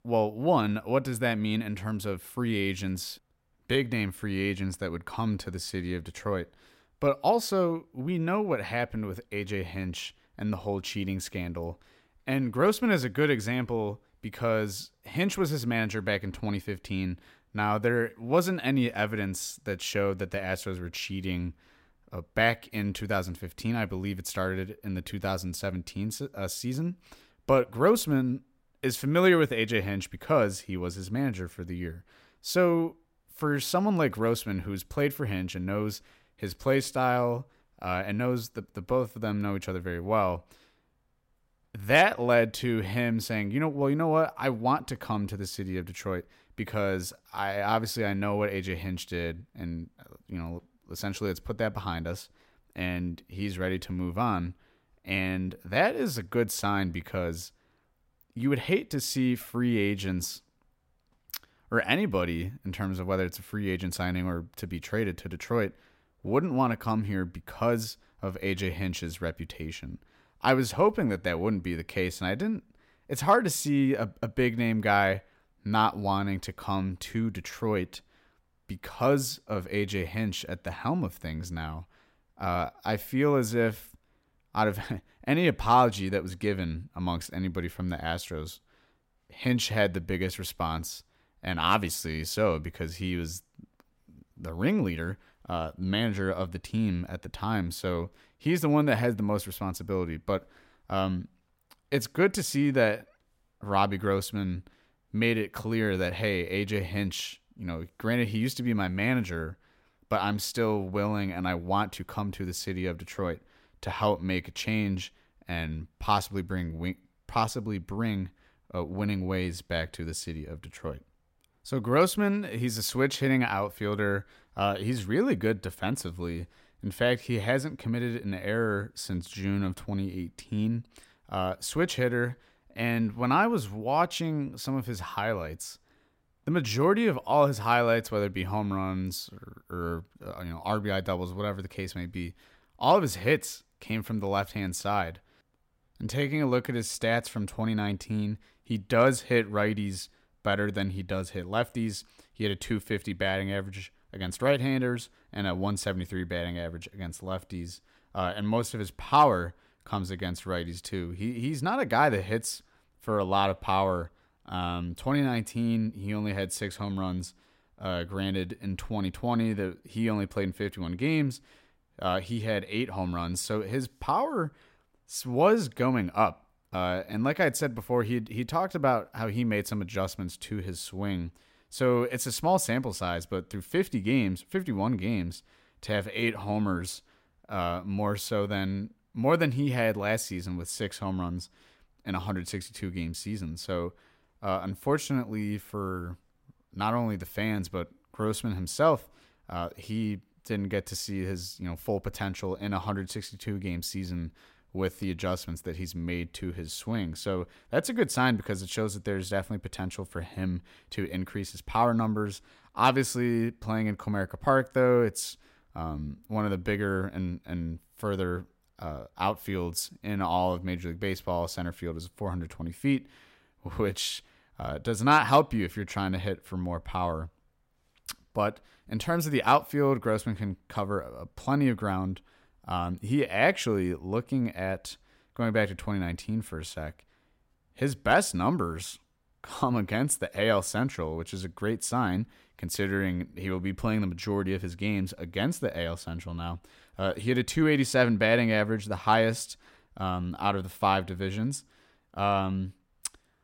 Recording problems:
none

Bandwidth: 16 kHz